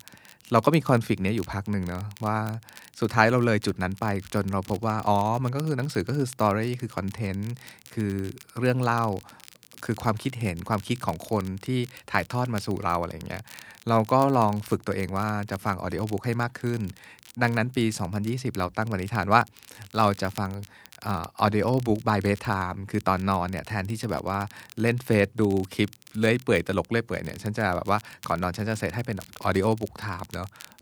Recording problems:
crackle, like an old record; faint; 20 dB below the speech

